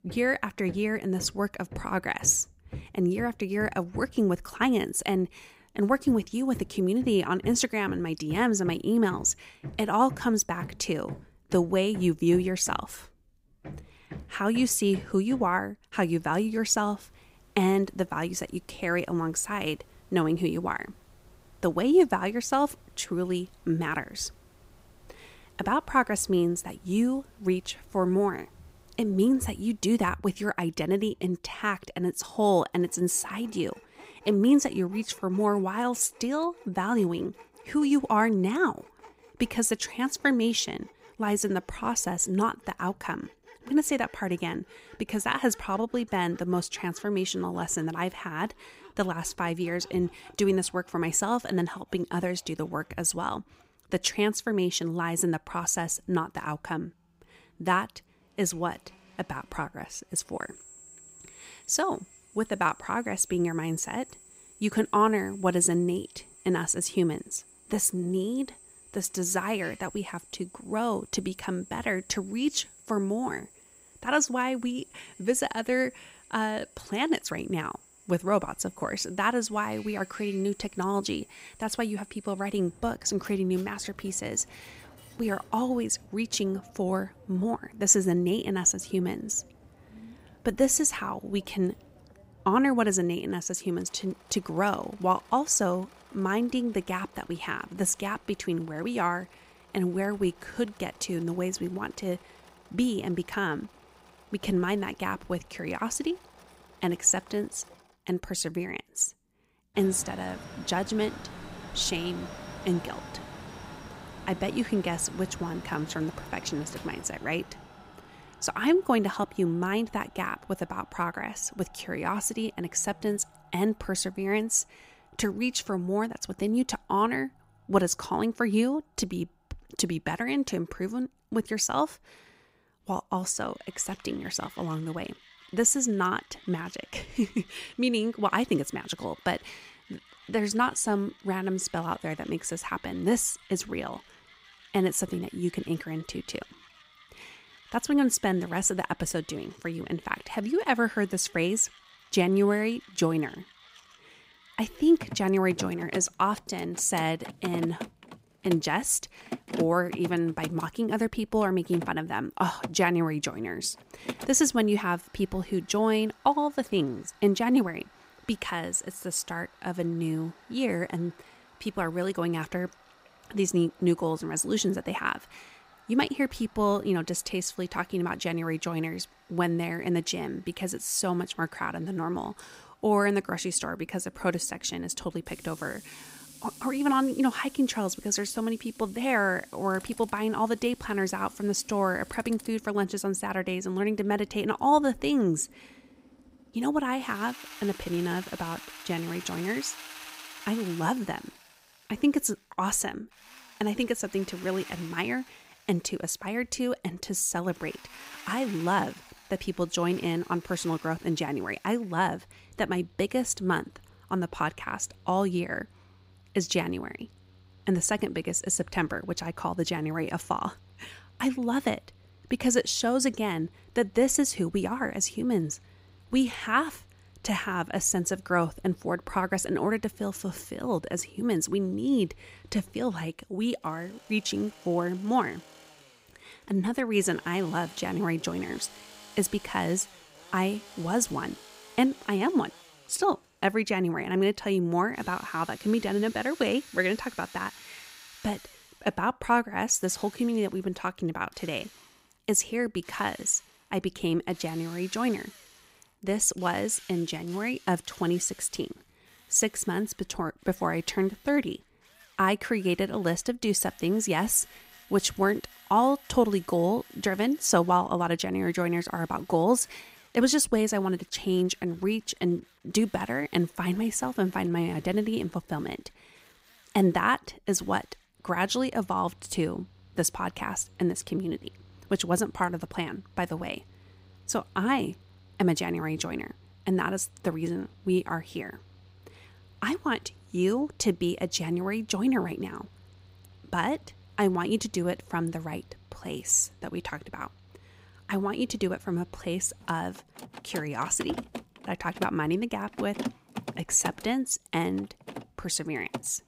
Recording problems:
machinery noise; faint; throughout; 20 dB below the speech

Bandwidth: 15.5 kHz